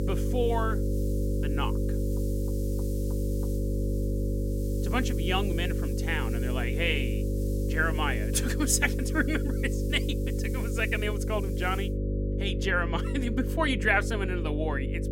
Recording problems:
electrical hum; loud; throughout; 50 Hz, 8 dB below the speech
hiss; noticeable; until 12 s; 20 dB below the speech

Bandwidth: 16 kHz